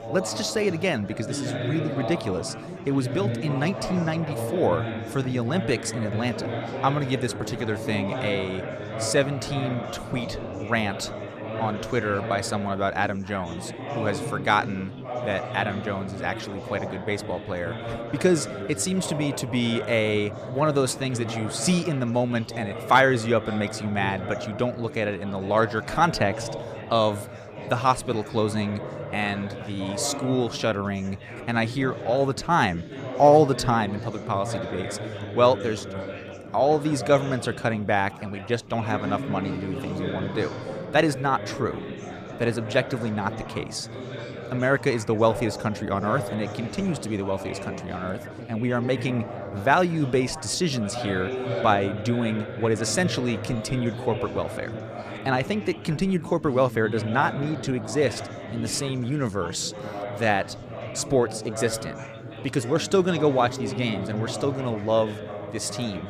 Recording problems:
chatter from many people; loud; throughout; 8 dB below the speech

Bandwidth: 14.5 kHz